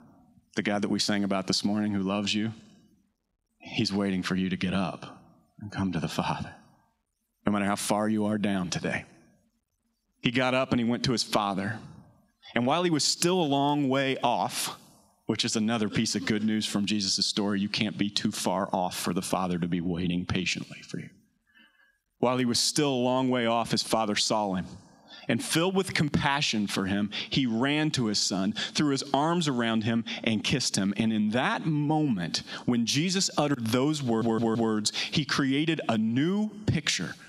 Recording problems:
squashed, flat; heavily
audio stuttering; at 34 s

